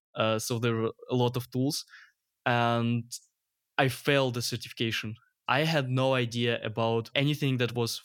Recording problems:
none

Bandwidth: 17 kHz